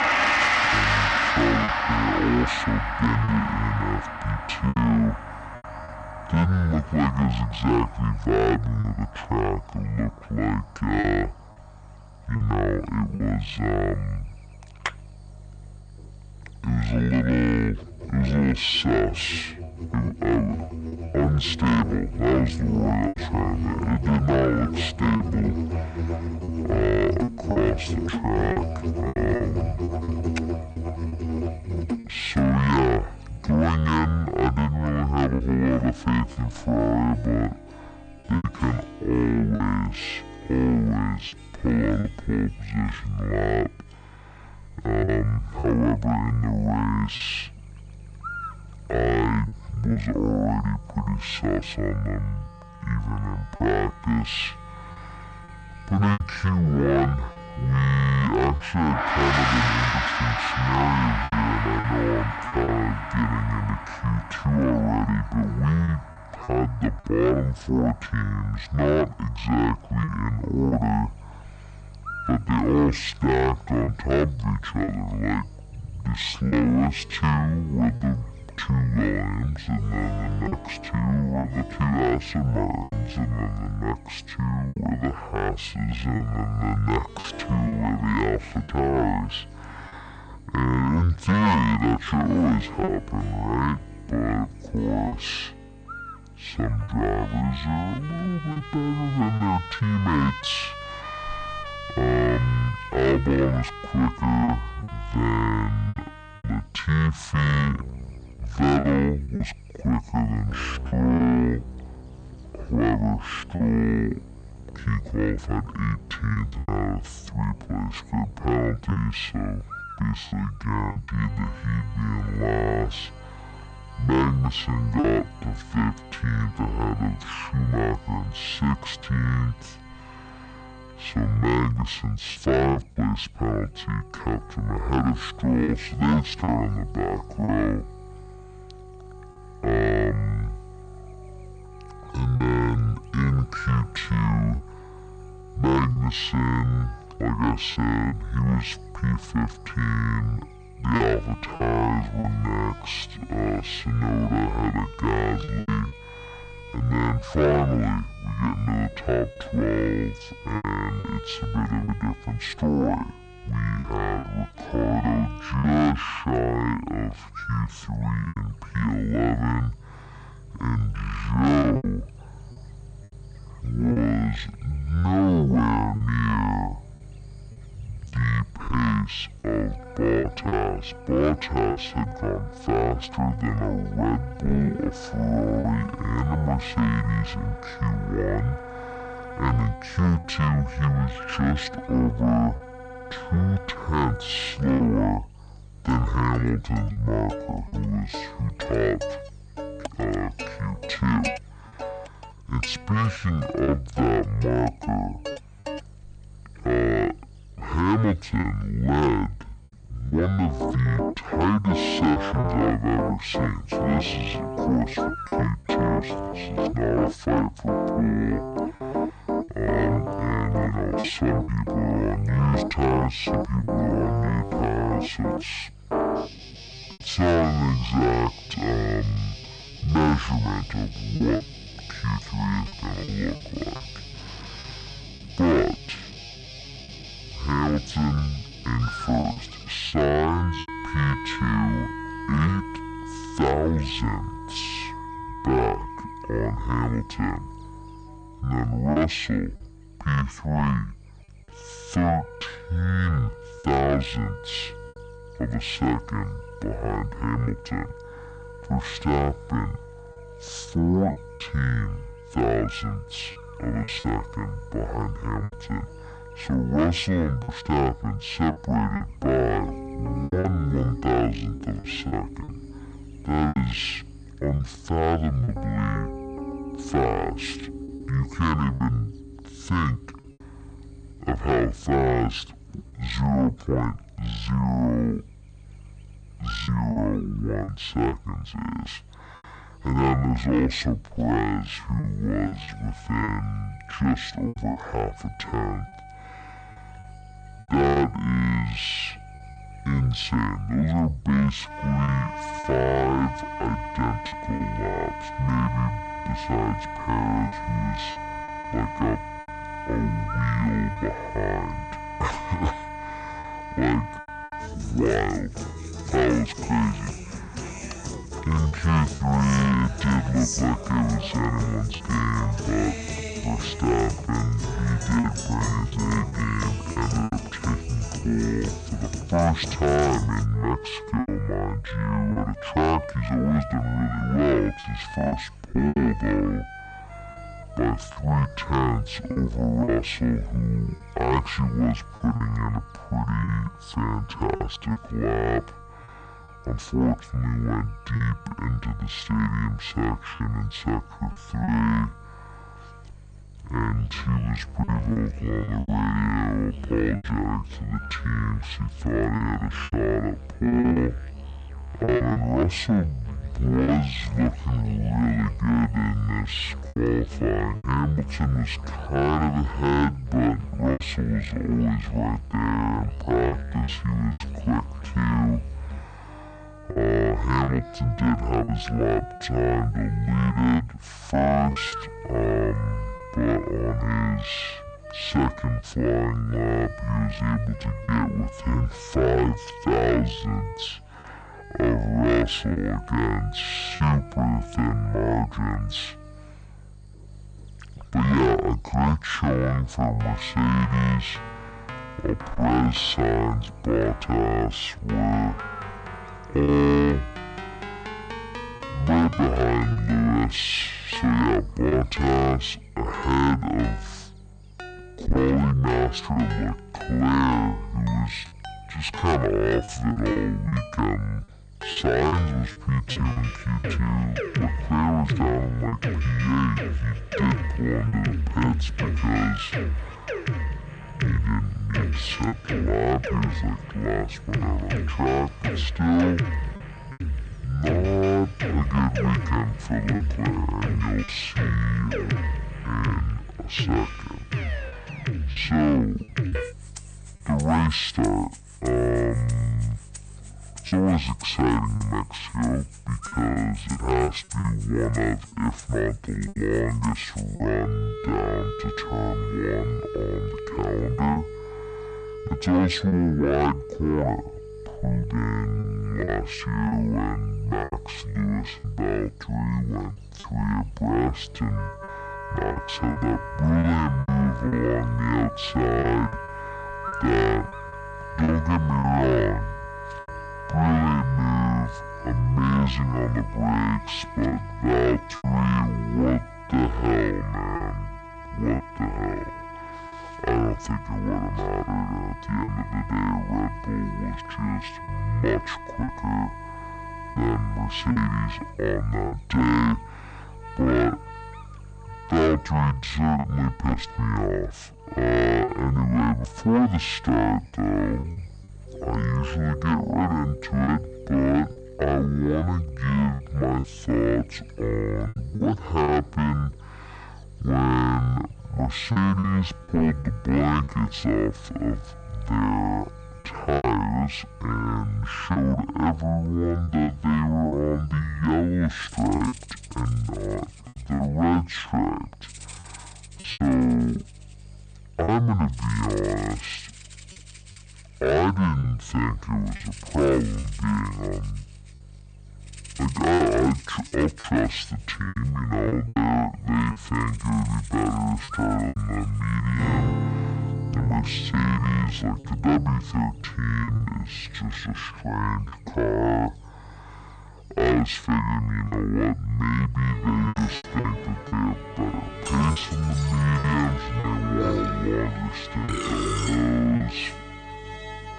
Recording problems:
wrong speed and pitch; too slow and too low; 0.5 times normal speed
distortion; slight; 10 dB below the speech
background music; loud; throughout; 9 dB below the speech
electrical hum; noticeable; throughout; 50 Hz, 20 dB below the speech
choppy; occasionally; 3% of the speech affected

